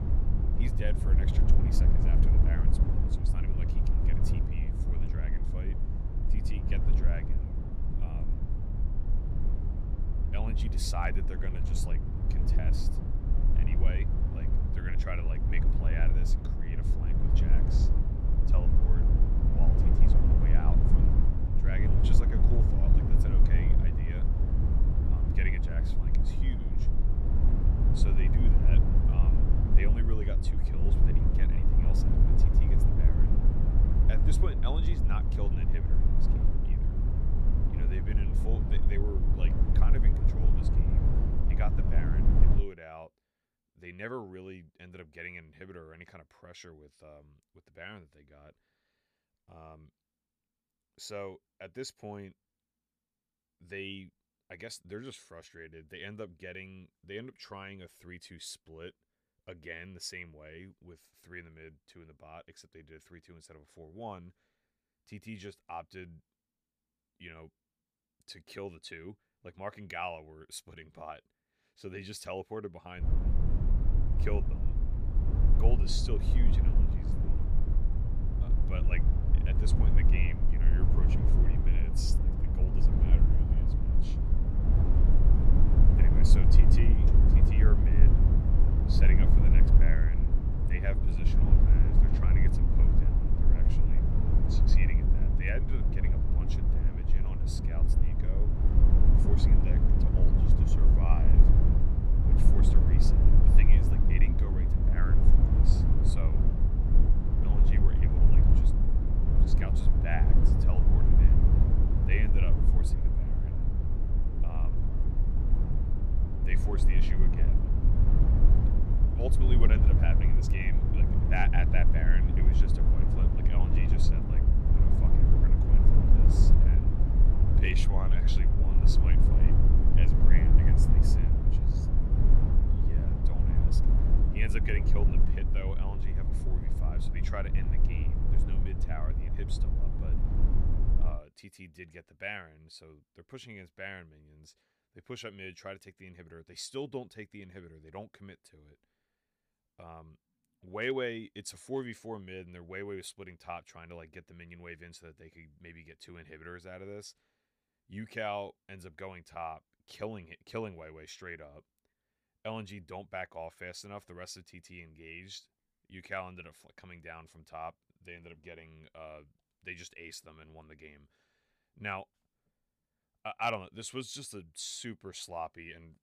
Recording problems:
low rumble; loud; until 43 s and from 1:13 to 2:21; as loud as the speech

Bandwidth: 15 kHz